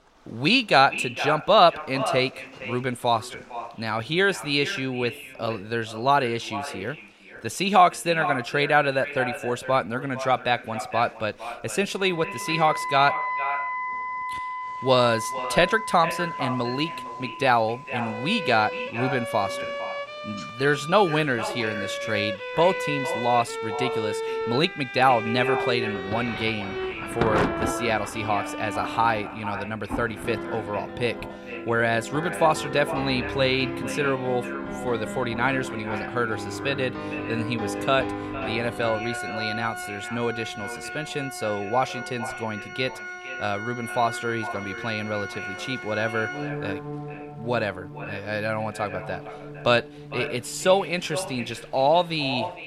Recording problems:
echo of what is said; strong; throughout; 460 ms later, 10 dB below the speech
background music; loud; from 13 s on; 8 dB below the speech
rain or running water; noticeable; throughout; 15 dB below the speech

